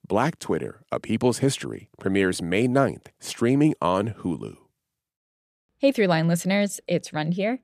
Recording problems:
none

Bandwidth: 14.5 kHz